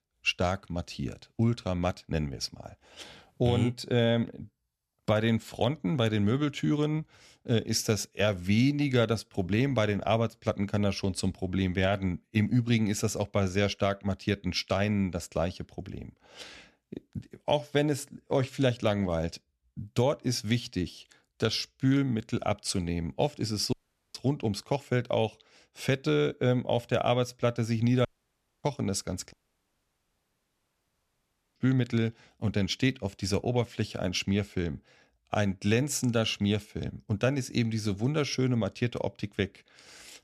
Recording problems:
audio cutting out; at 24 s, at 28 s for 0.5 s and at 29 s for 2 s

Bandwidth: 13.5 kHz